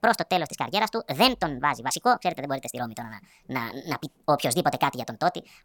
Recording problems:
wrong speed and pitch; too fast and too high; 1.5 times normal speed

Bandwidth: 18 kHz